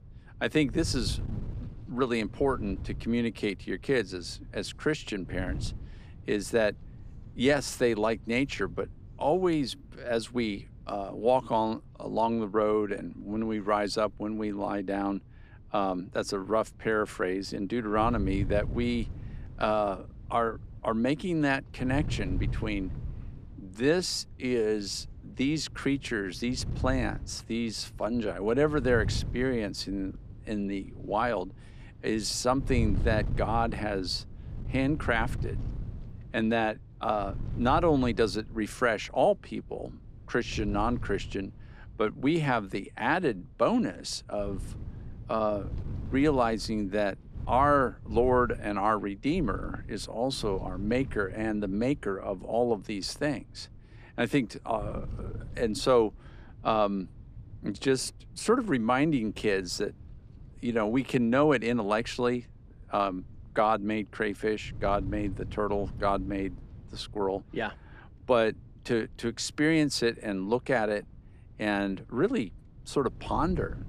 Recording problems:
wind noise on the microphone; occasional gusts; 25 dB below the speech

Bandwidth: 15.5 kHz